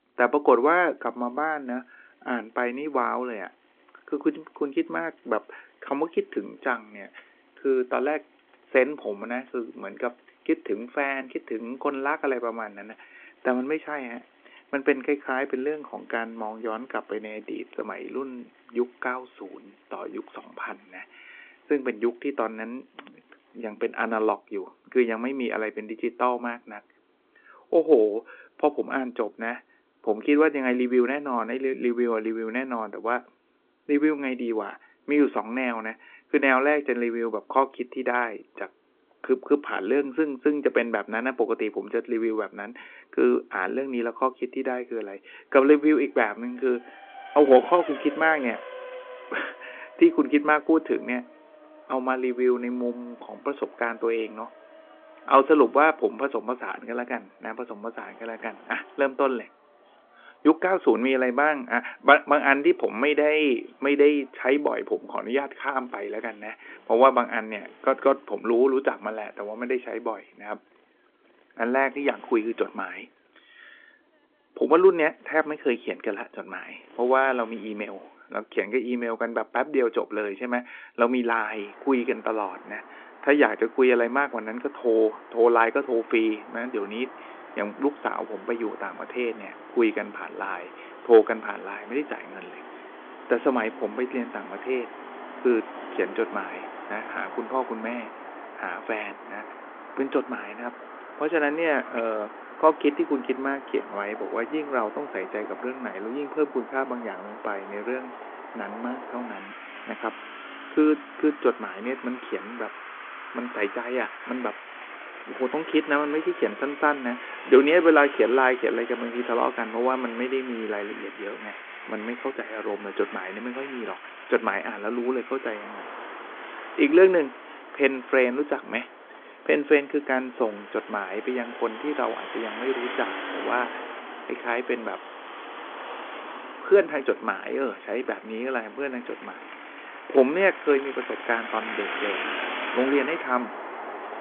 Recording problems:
phone-call audio
traffic noise; noticeable; throughout; 15 dB below the speech

